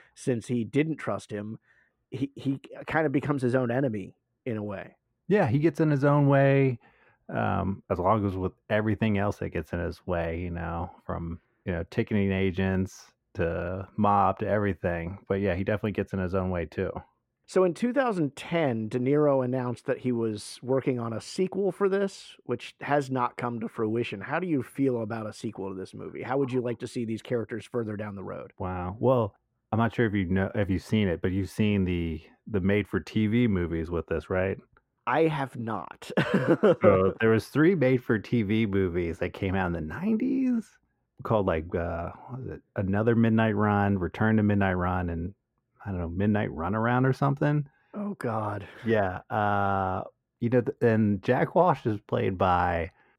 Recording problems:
muffled; very; fading above 2.5 kHz

